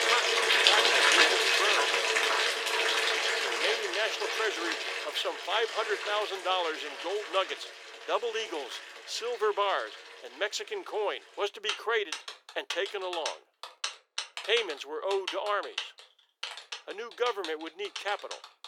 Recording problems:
thin; very; fading below 400 Hz
household noises; very loud; throughout; 5 dB above the speech

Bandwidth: 18 kHz